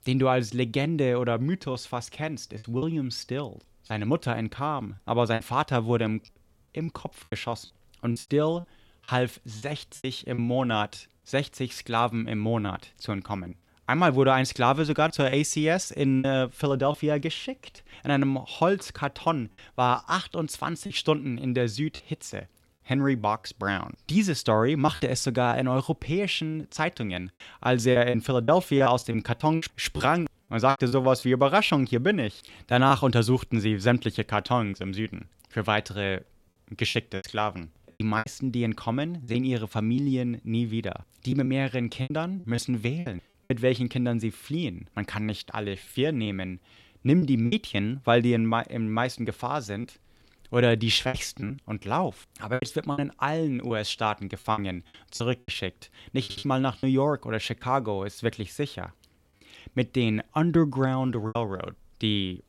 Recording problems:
choppy; very; 6% of the speech affected
audio stuttering; at 56 s

